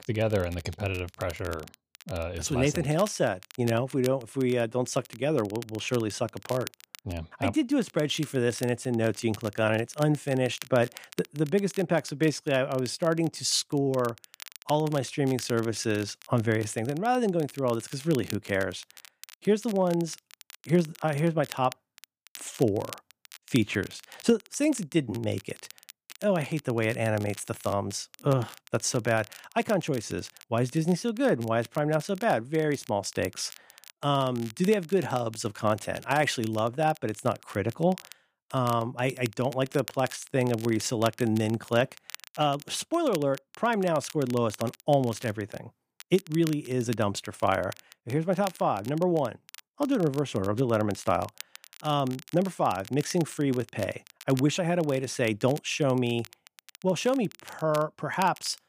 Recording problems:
crackle, like an old record; noticeable; 20 dB below the speech

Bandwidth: 15 kHz